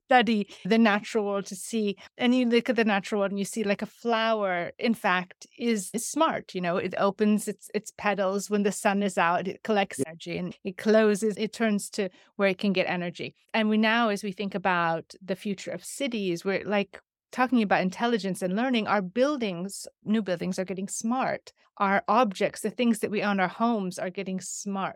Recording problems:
none

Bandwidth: 17 kHz